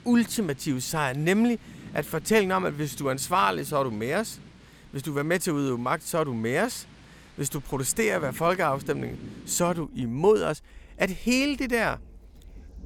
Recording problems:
rain or running water; faint; throughout; 20 dB below the speech

